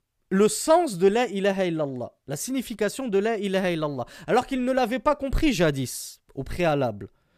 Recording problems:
none

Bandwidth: 15 kHz